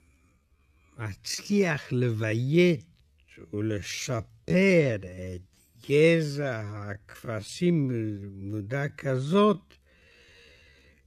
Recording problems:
wrong speed, natural pitch; too slow; 0.5 times normal speed

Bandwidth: 14.5 kHz